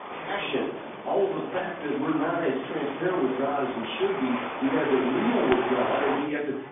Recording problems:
phone-call audio; poor line; nothing above 3.5 kHz
off-mic speech; far
room echo; noticeable; dies away in 0.6 s
traffic noise; loud; throughout; 6 dB below the speech
chatter from many people; noticeable; throughout; 15 dB below the speech

